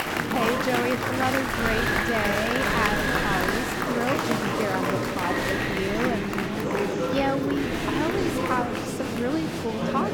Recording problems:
murmuring crowd; very loud; throughout; 2 dB above the speech
wind noise on the microphone; heavy; as loud as the speech

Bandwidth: 17.5 kHz